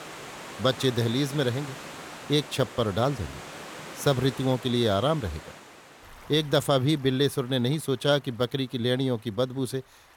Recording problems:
rain or running water; noticeable; throughout; 15 dB below the speech

